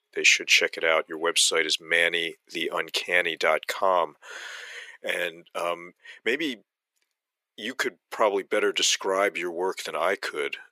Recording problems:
thin; very; fading below 350 Hz

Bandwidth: 15 kHz